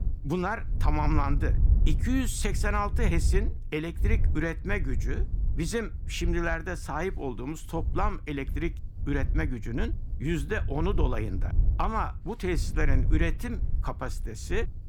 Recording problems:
wind noise on the microphone; occasional gusts; 15 dB below the speech

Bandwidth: 18.5 kHz